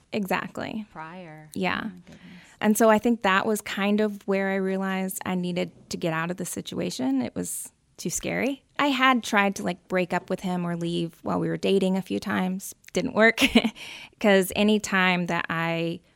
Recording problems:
none

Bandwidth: 16.5 kHz